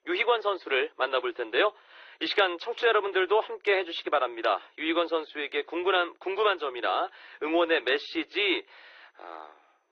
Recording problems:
thin; very; fading below 350 Hz
muffled; slightly; fading above 4 kHz
garbled, watery; slightly

